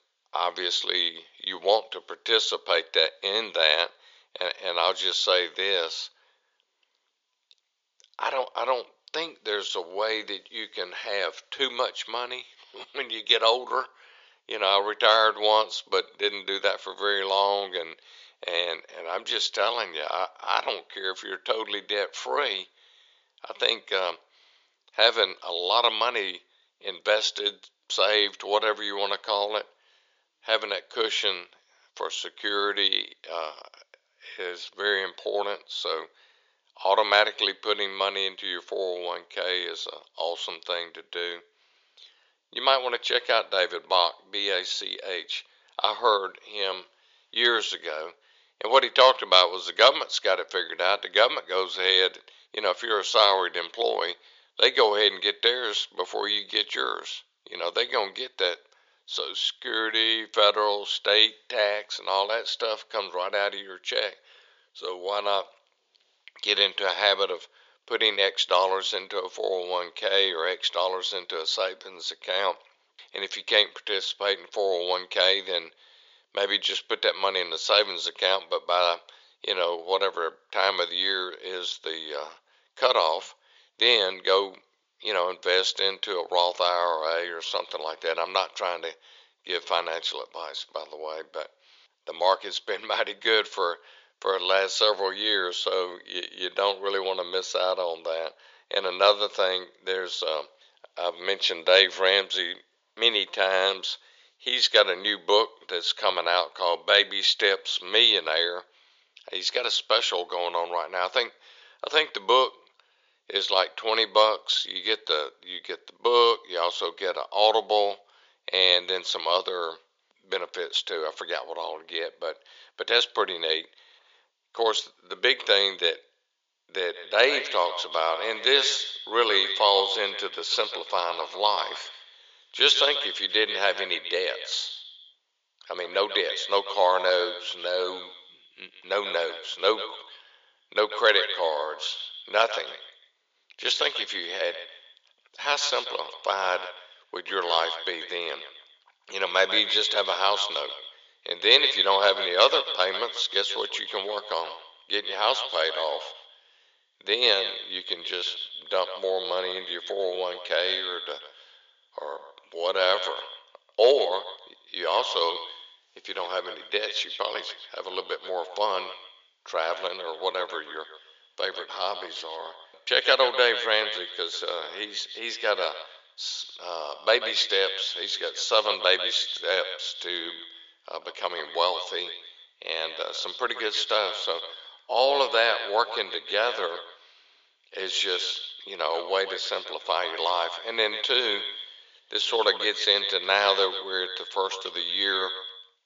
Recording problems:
echo of what is said; strong; from 2:07 on; 140 ms later, 9 dB below the speech
thin; very; fading below 500 Hz
high frequencies cut off; noticeable; nothing above 7 kHz

